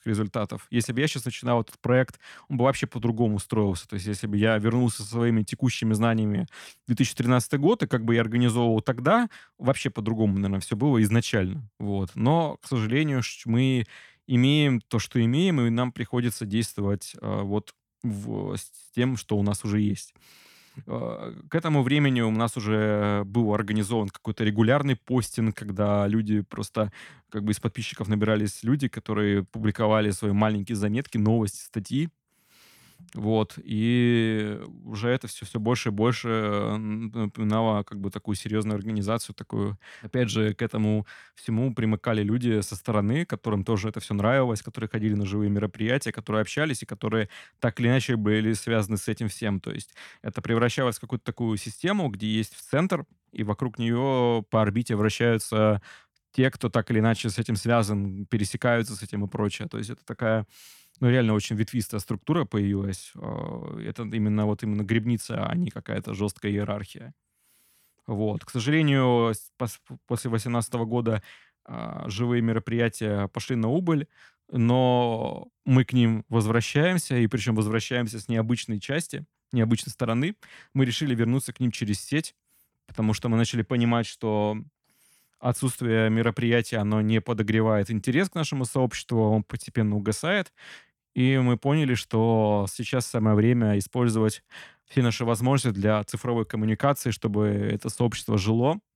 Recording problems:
none

